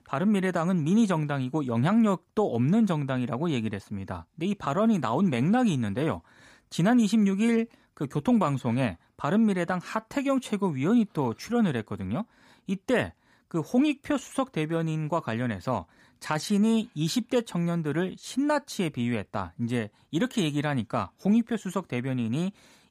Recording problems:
none

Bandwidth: 15 kHz